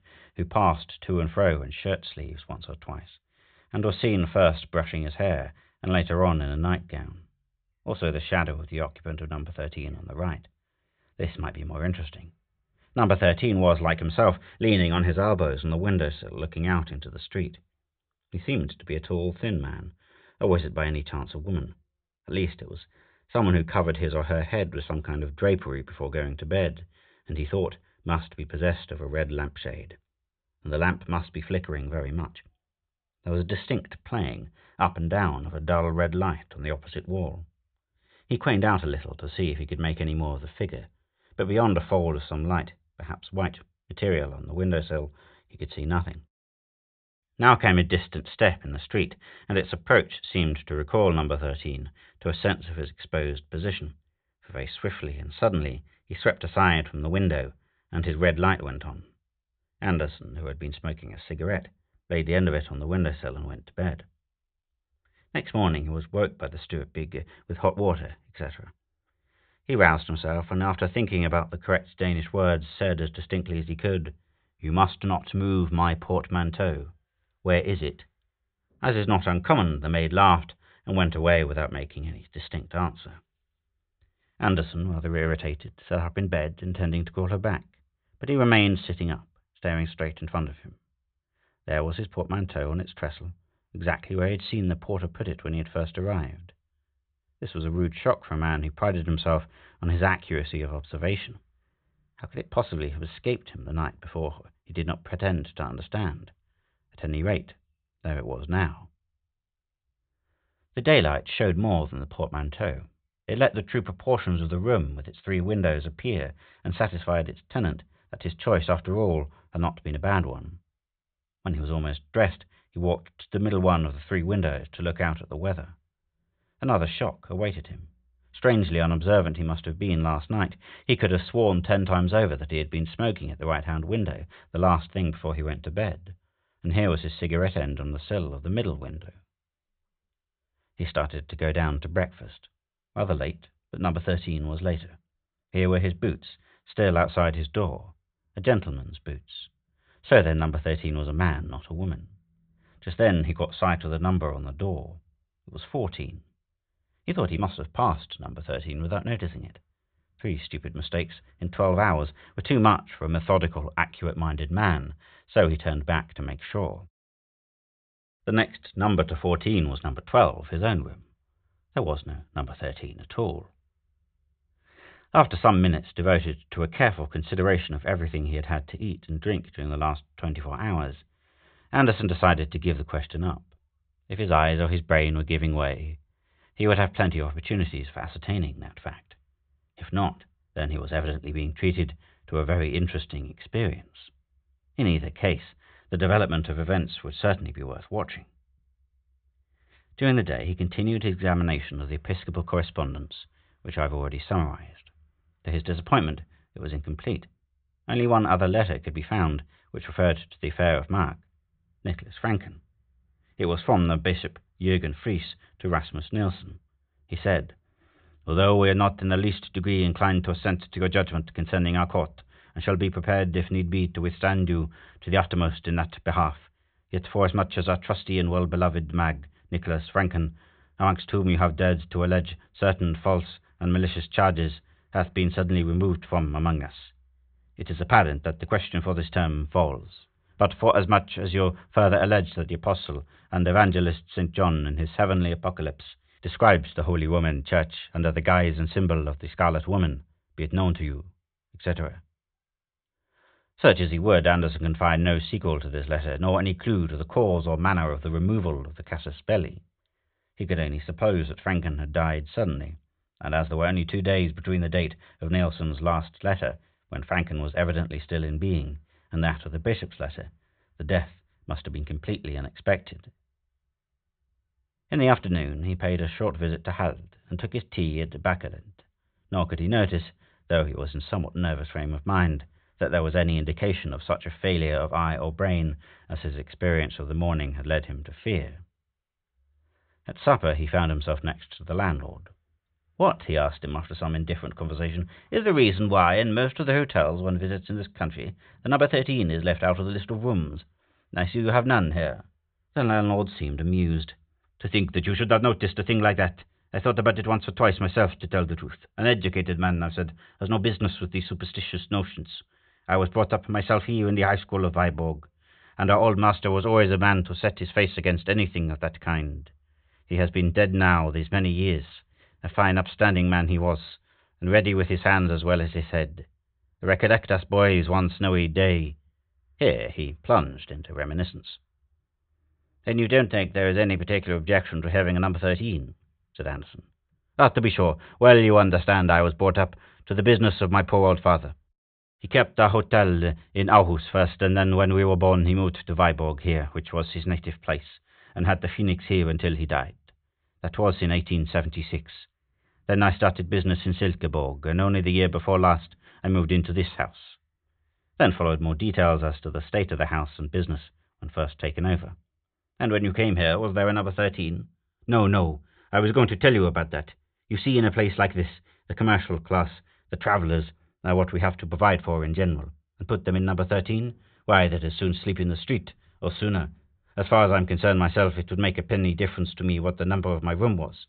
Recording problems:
high frequencies cut off; severe; nothing above 4 kHz

